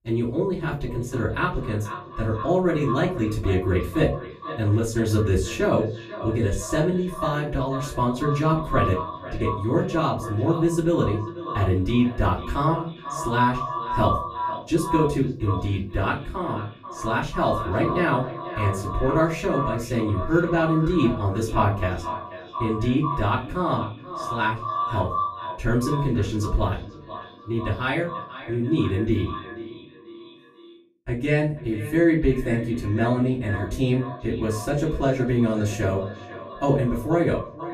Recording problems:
echo of what is said; strong; throughout; 490 ms later, 9 dB below the speech
off-mic speech; far
room echo; slight; dies away in 0.3 s

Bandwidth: 15 kHz